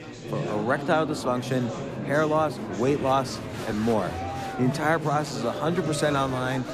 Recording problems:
murmuring crowd; loud; throughout; 6 dB below the speech

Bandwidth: 14.5 kHz